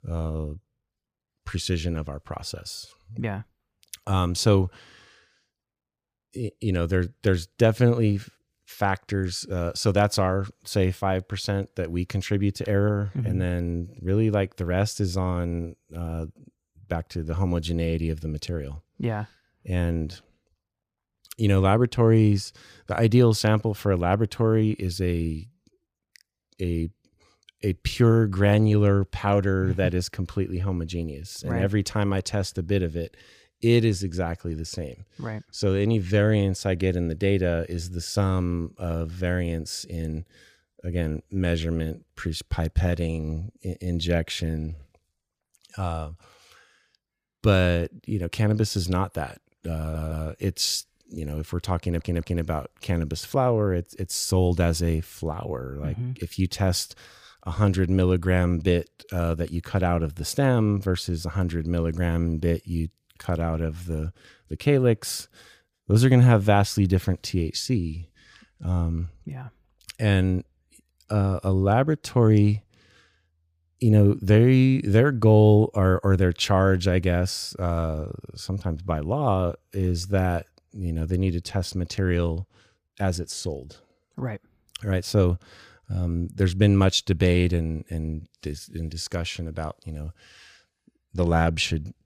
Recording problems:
audio stuttering; at 50 s and at 52 s

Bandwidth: 15 kHz